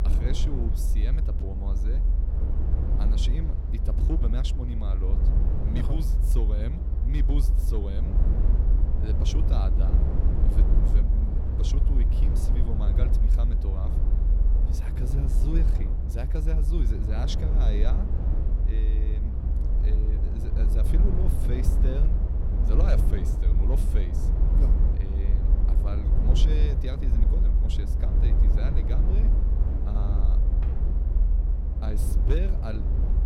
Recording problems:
low rumble; loud; throughout; 1 dB below the speech
wind noise on the microphone; occasional gusts; 20 dB below the speech
door banging; faint; at 31 s; peak 15 dB below the speech

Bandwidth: 16.5 kHz